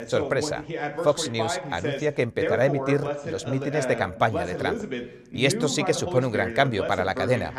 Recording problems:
voice in the background; loud; throughout; 5 dB below the speech

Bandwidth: 14.5 kHz